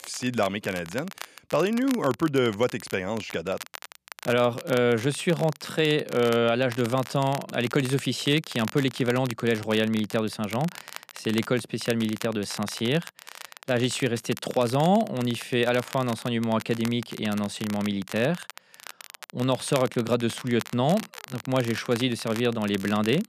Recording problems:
crackle, like an old record; noticeable; 15 dB below the speech

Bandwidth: 14.5 kHz